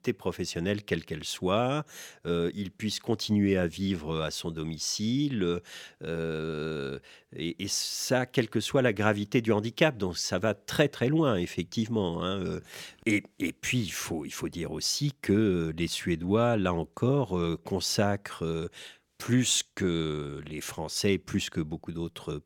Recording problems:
none

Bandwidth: 17.5 kHz